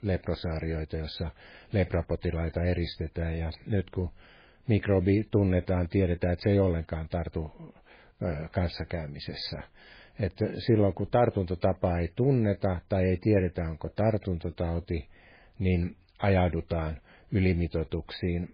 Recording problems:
garbled, watery; badly; nothing above 4 kHz

